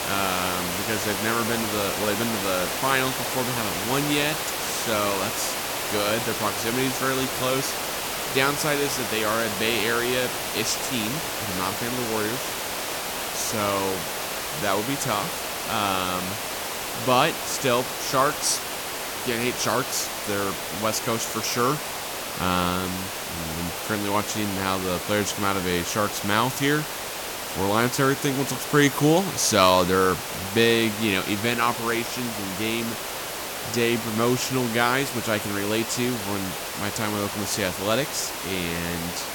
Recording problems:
hiss; loud; throughout; 3 dB below the speech

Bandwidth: 17.5 kHz